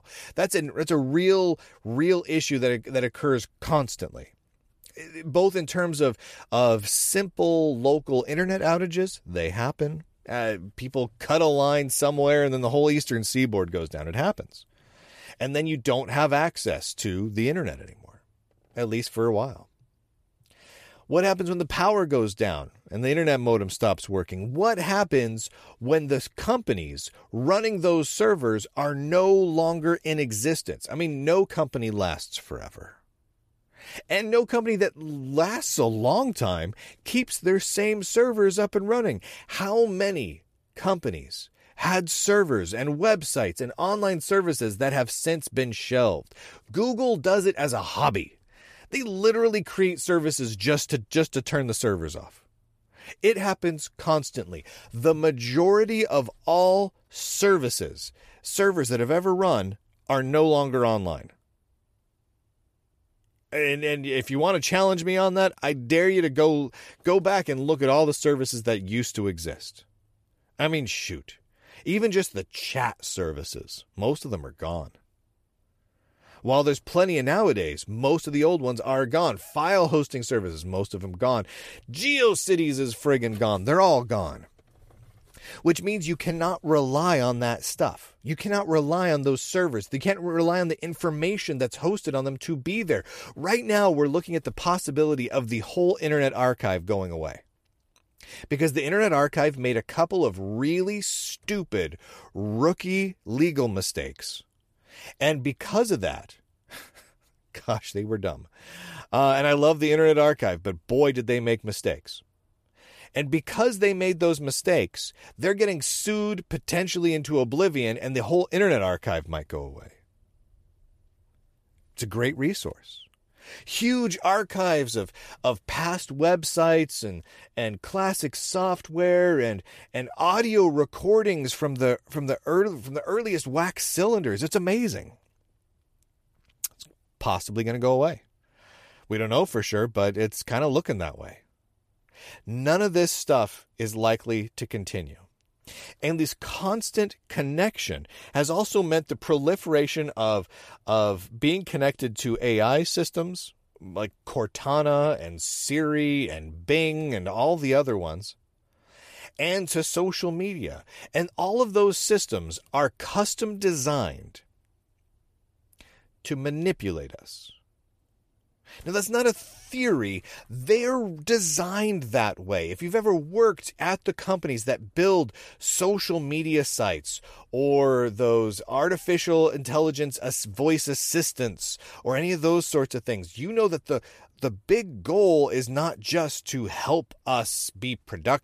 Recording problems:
none

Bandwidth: 14.5 kHz